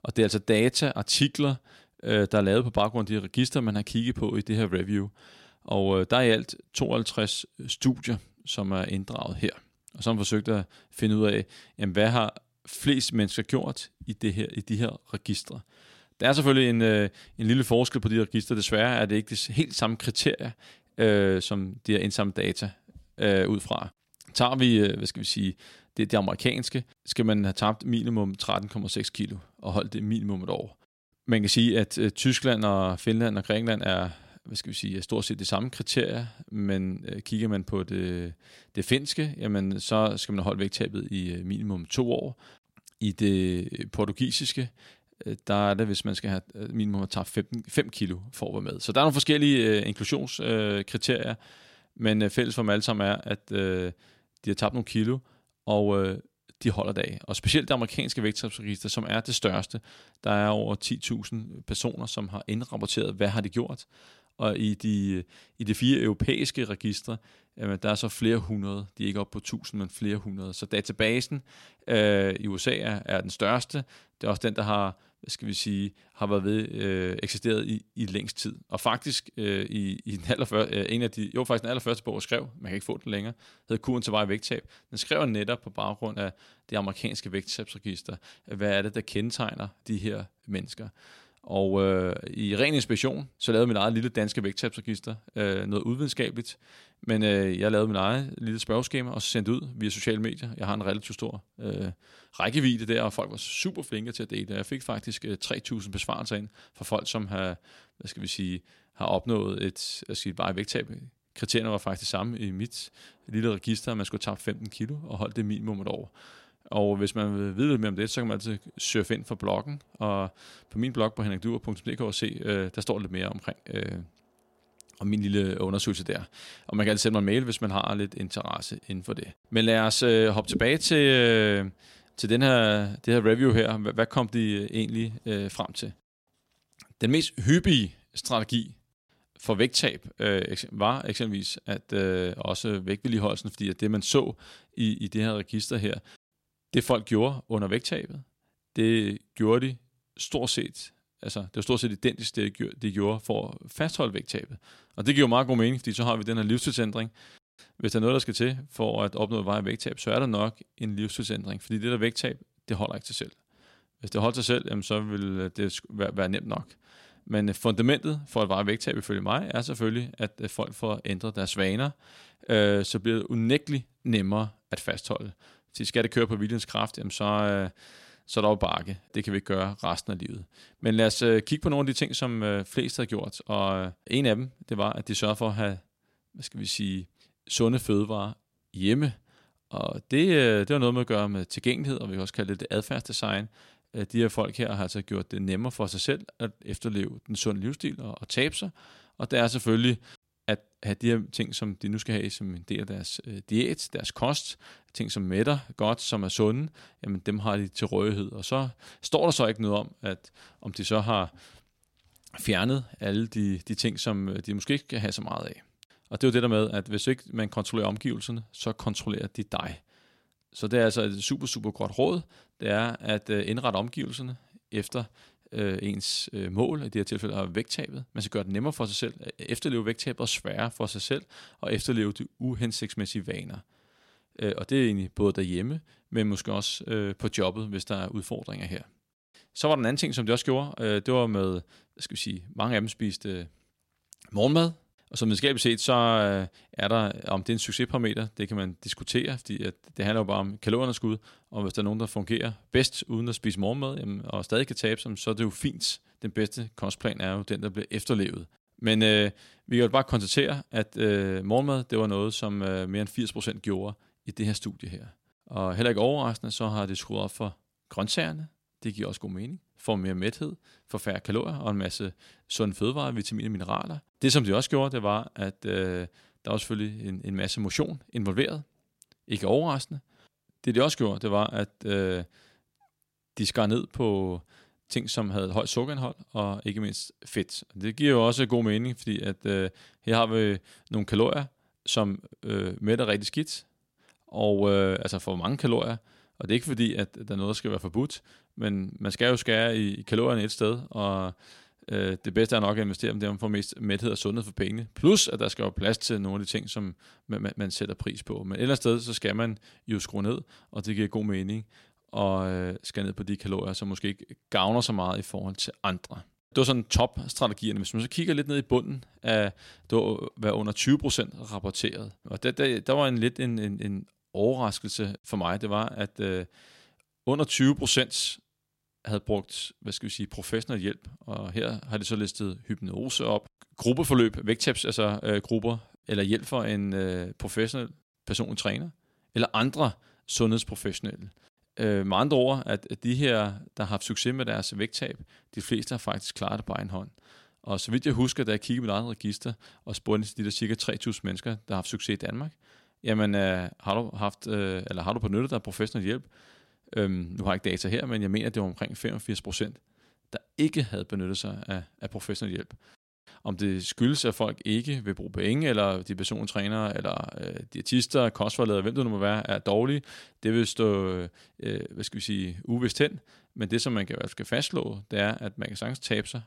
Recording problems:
none

